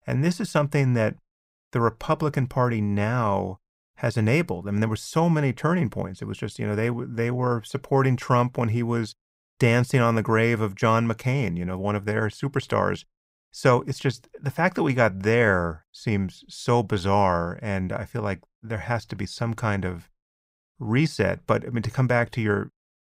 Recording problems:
none

